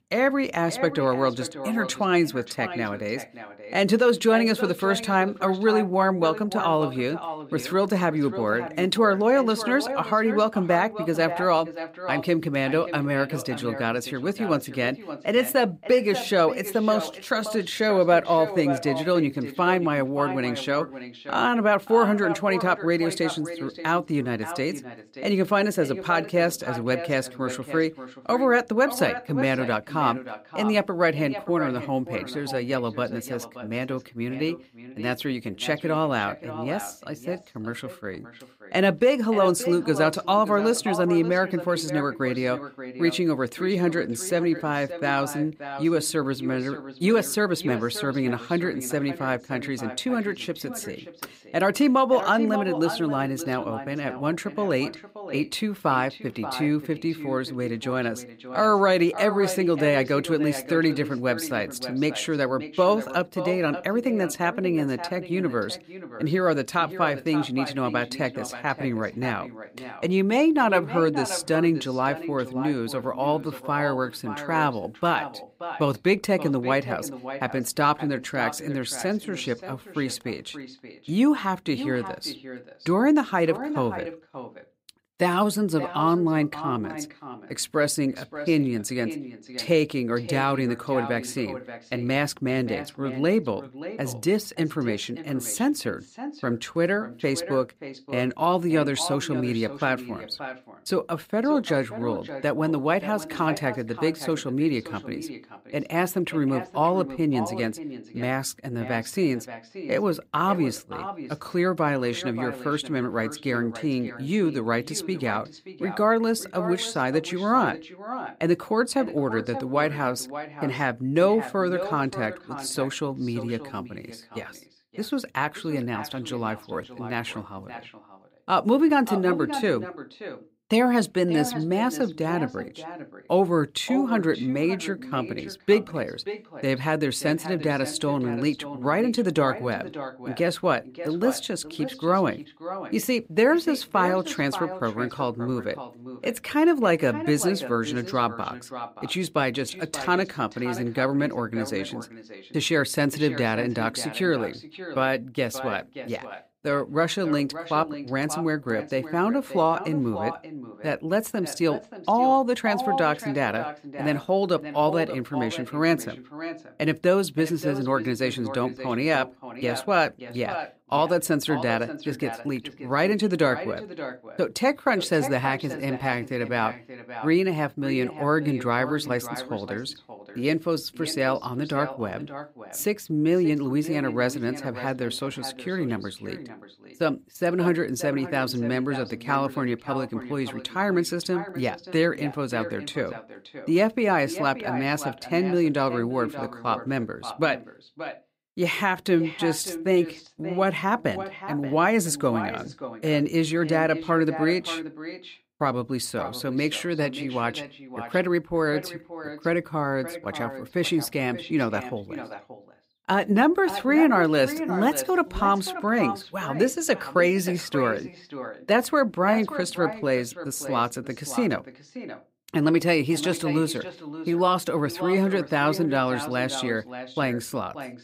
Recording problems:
echo of what is said; strong; throughout; 580 ms later, 10 dB below the speech

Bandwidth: 15.5 kHz